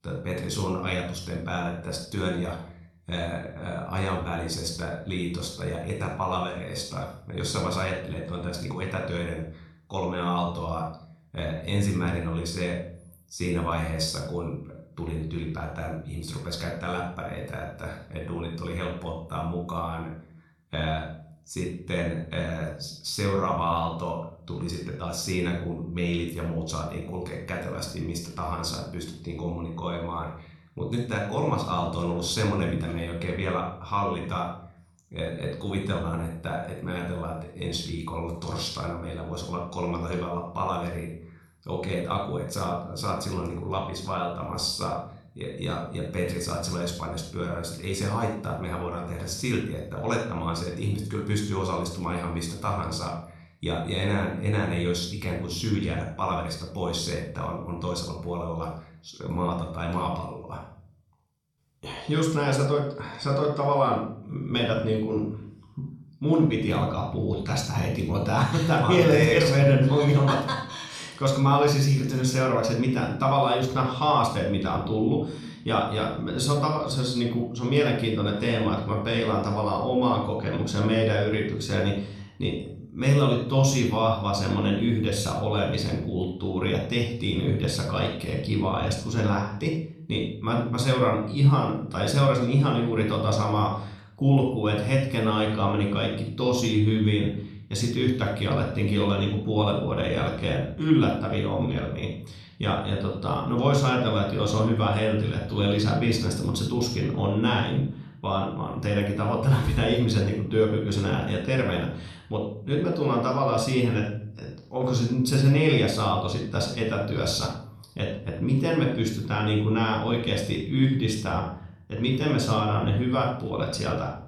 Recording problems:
room echo; noticeable; dies away in 0.5 s
off-mic speech; somewhat distant

